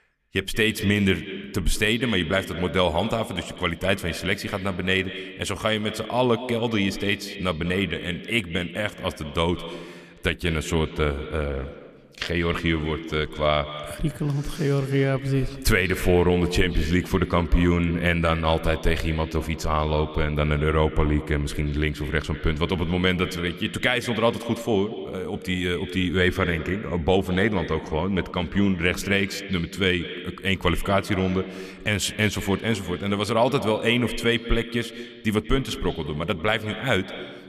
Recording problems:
echo of what is said; strong; throughout; 180 ms later, 10 dB below the speech

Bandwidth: 14.5 kHz